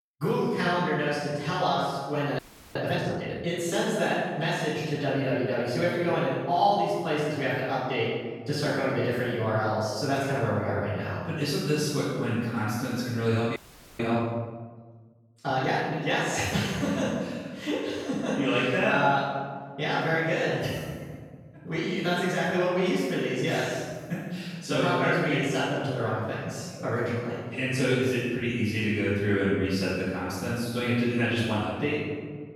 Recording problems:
room echo; strong; dies away in 1.5 s
off-mic speech; far
audio freezing; at 2.5 s and at 14 s

